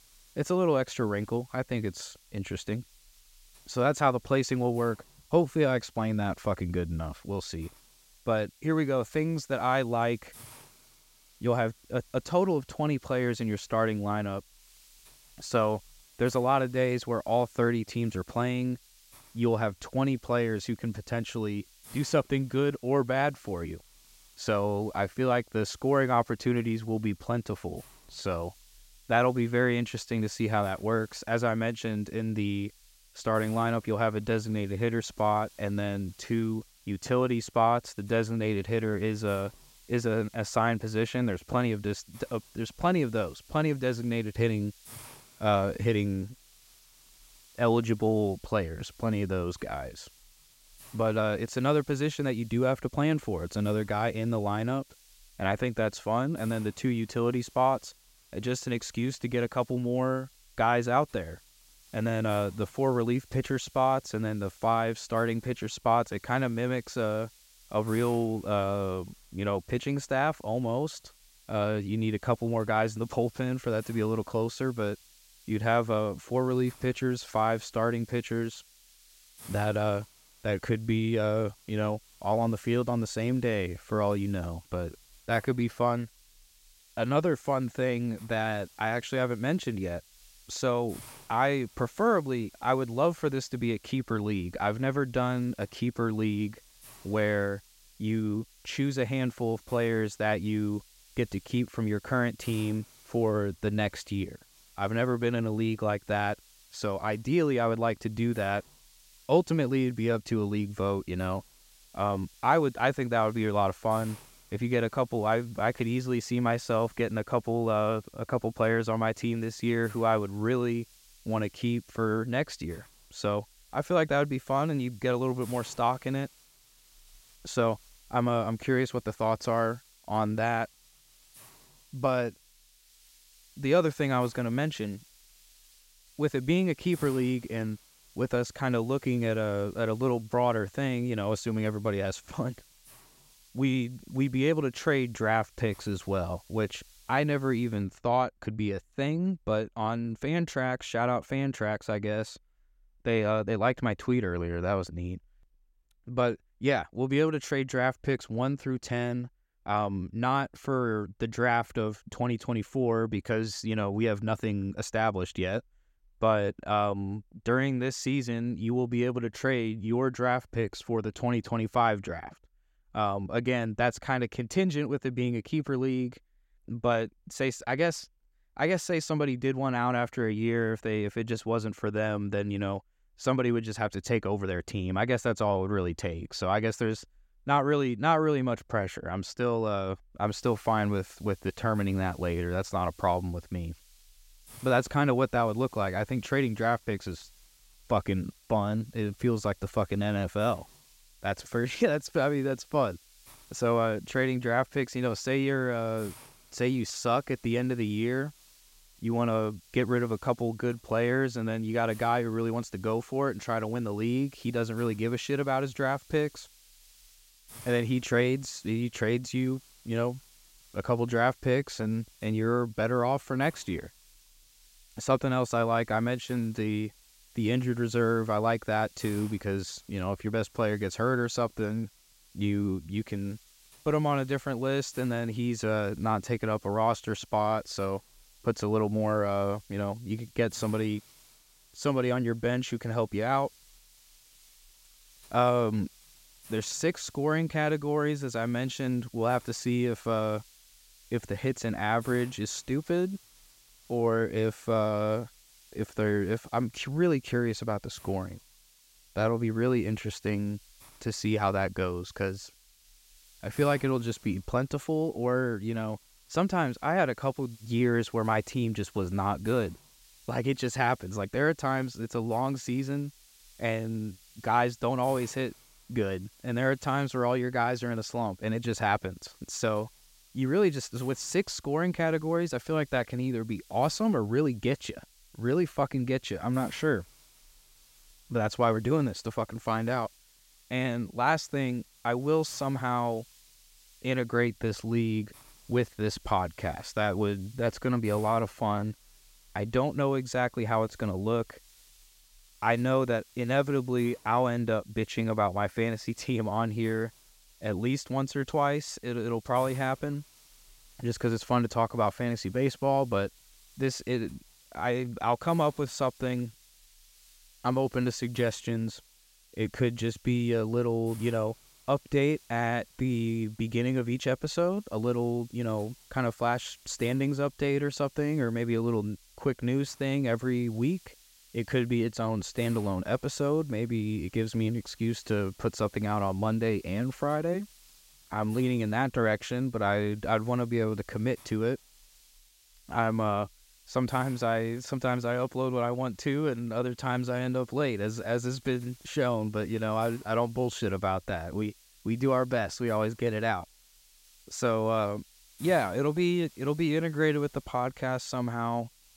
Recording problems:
hiss; faint; until 2:28 and from 3:10 on; 25 dB below the speech

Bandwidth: 16 kHz